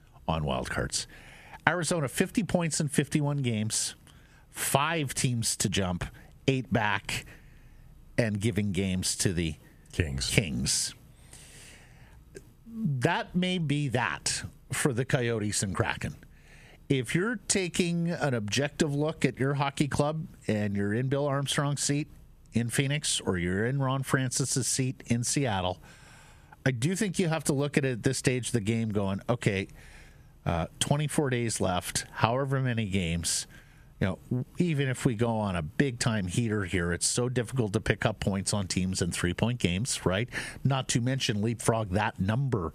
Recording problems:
squashed, flat; somewhat

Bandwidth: 14.5 kHz